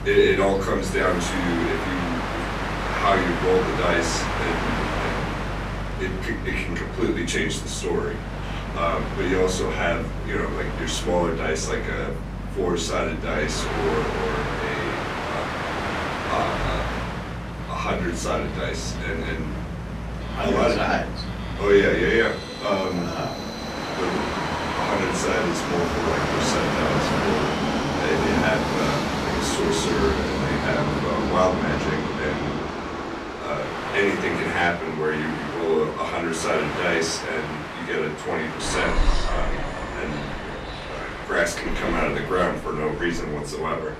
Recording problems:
off-mic speech; far
room echo; slight; dies away in 0.3 s
train or aircraft noise; loud; throughout; 3 dB below the speech
alarms or sirens; faint; throughout; 20 dB below the speech

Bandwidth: 14 kHz